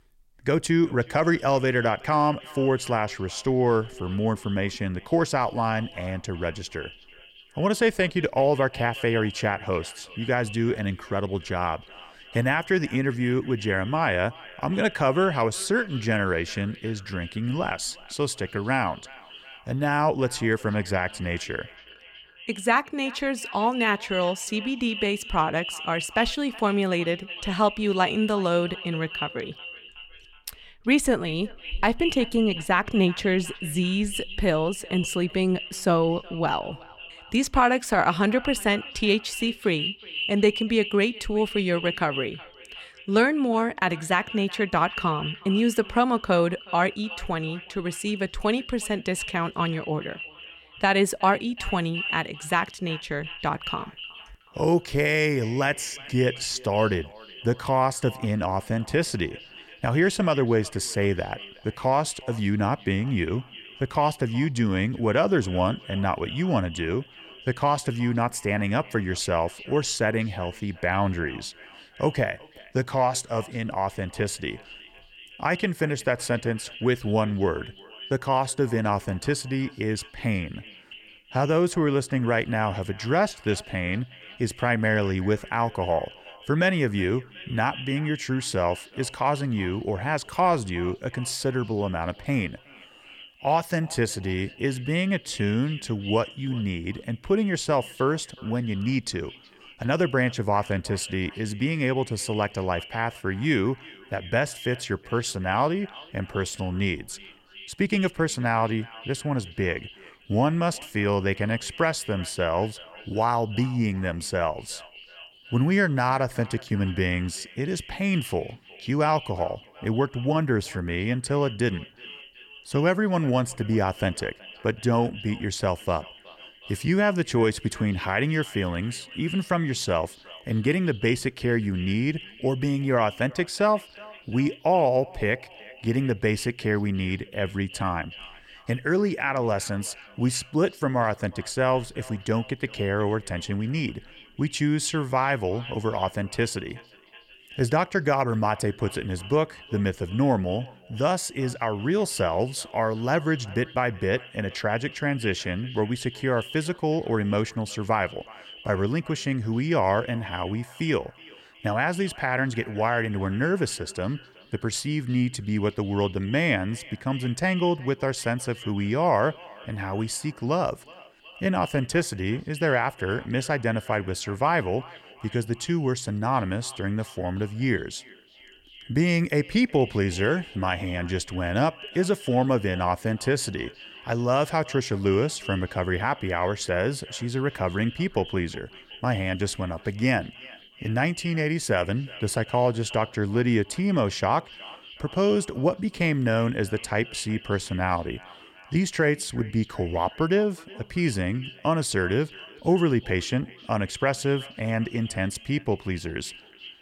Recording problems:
echo of what is said; noticeable; throughout; 370 ms later, 15 dB below the speech

